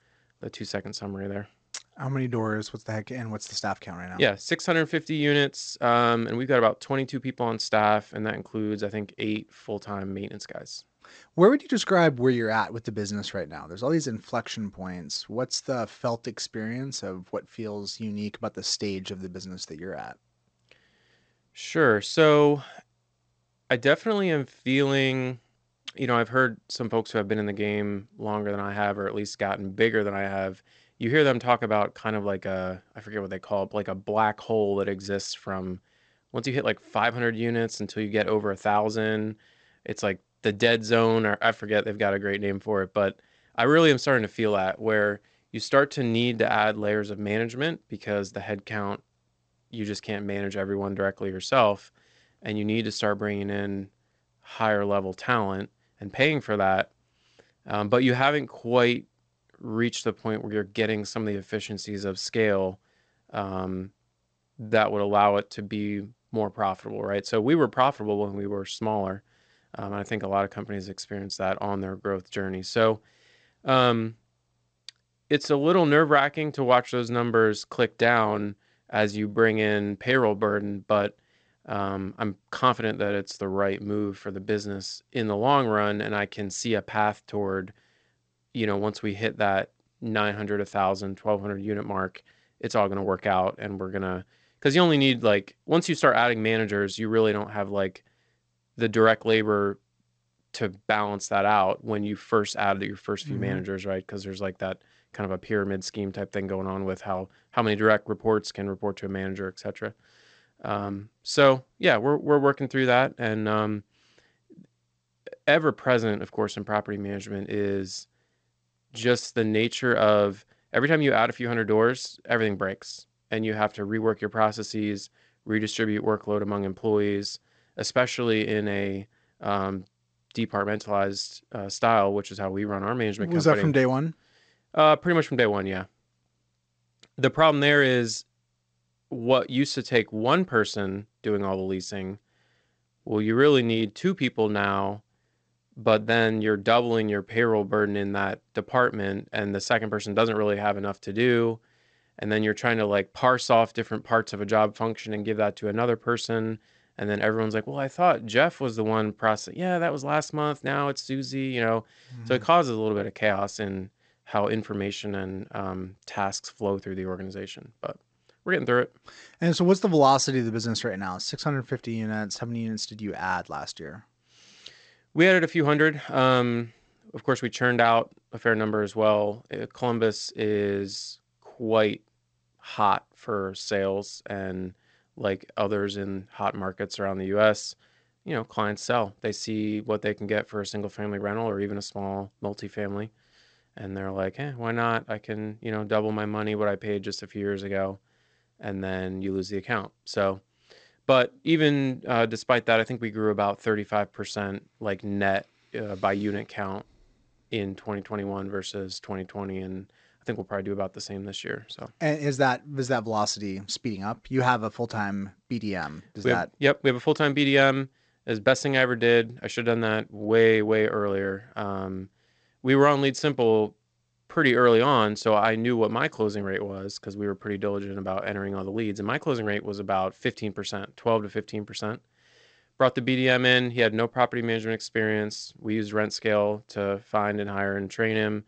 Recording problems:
garbled, watery; slightly; nothing above 8 kHz

